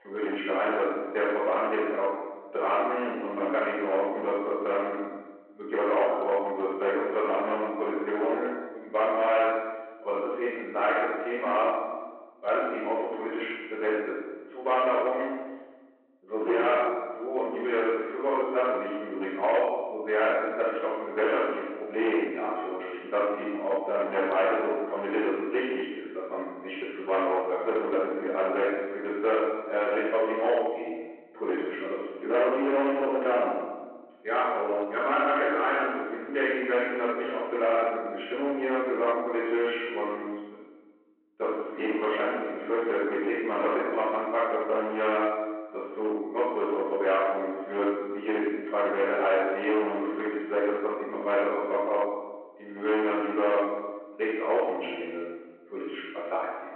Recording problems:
off-mic speech; far
room echo; noticeable; dies away in 1.1 s
phone-call audio
distortion; slight; 10% of the sound clipped

